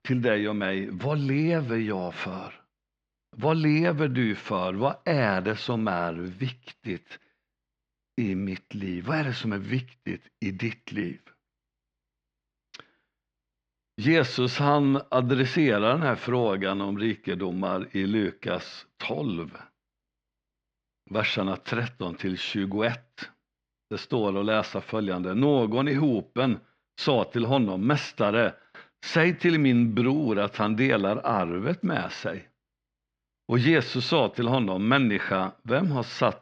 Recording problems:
muffled; very slightly; fading above 4 kHz

